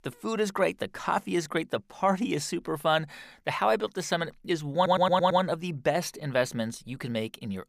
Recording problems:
audio stuttering; at 5 s

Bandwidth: 15 kHz